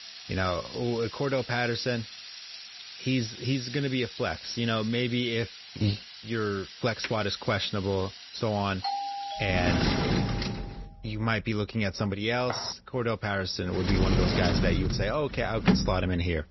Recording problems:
garbled, watery; badly
high frequencies cut off; noticeable; nothing above 5.5 kHz
household noises; loud; throughout; 4 dB below the speech
doorbell; noticeable; from 9 to 10 s; peak 3 dB below the speech
footsteps; noticeable; at 12 s; peak 8 dB below the speech

